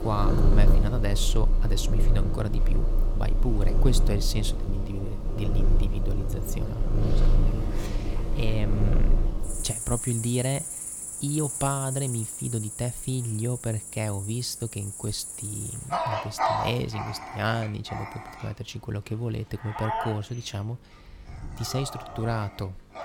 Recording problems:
animal sounds; very loud; throughout; 1 dB above the speech
electrical hum; faint; throughout; 50 Hz, 25 dB below the speech

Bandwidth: 17.5 kHz